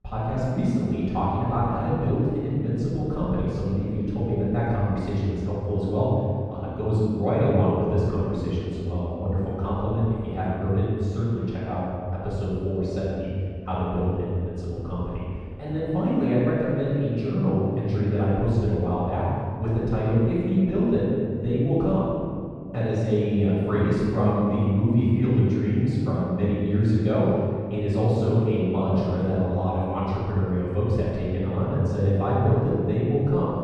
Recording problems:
room echo; strong; dies away in 2 s
off-mic speech; far
muffled; very; fading above 3 kHz

